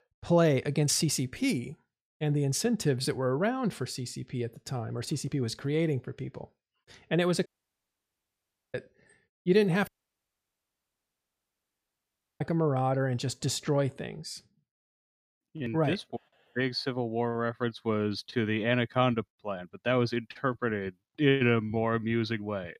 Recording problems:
audio cutting out; at 7.5 s for 1.5 s and at 10 s for 2.5 s

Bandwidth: 15 kHz